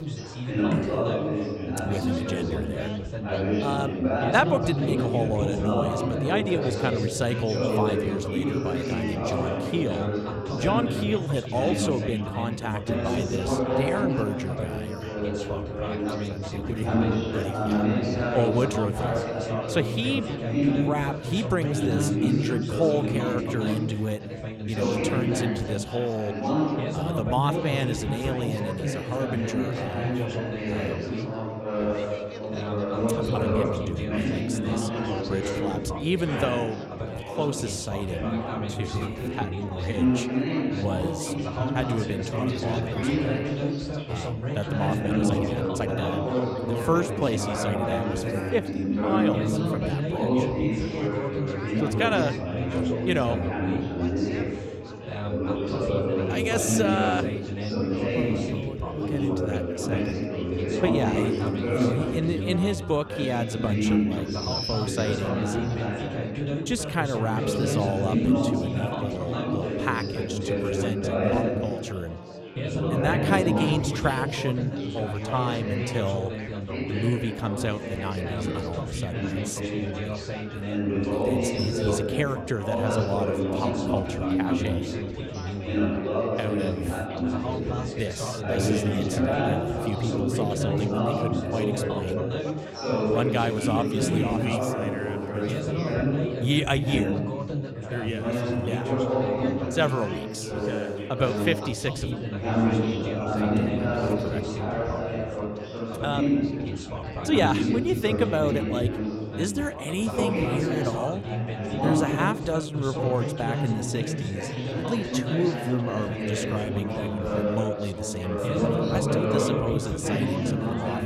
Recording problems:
chatter from many people; very loud; throughout; 2 dB above the speech
high-pitched whine; faint; throughout; 2.5 kHz, 35 dB below the speech
uneven, jittery; strongly; from 4 s to 1:55

